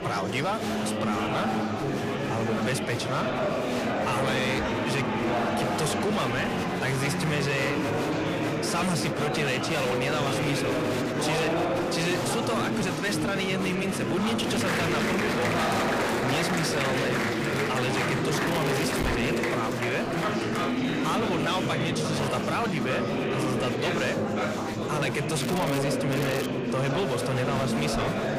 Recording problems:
distortion; slight; 20% of the sound clipped
murmuring crowd; very loud; throughout; 2 dB above the speech
crackling; loud; at 18 s, at 25 s and at 26 s; 10 dB below the speech

